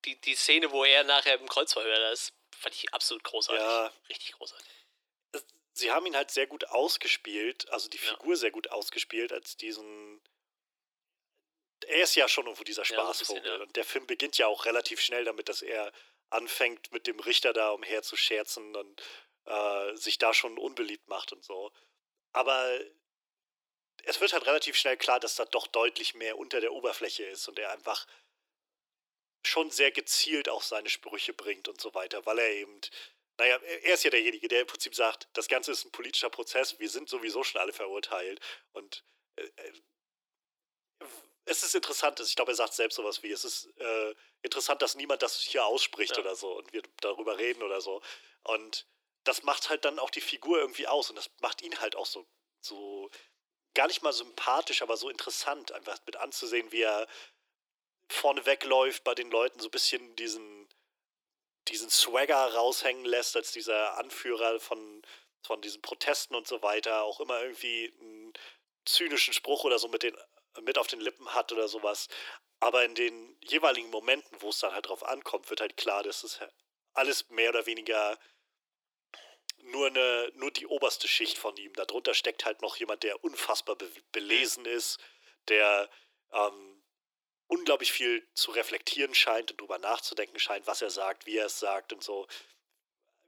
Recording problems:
thin; very; fading below 300 Hz

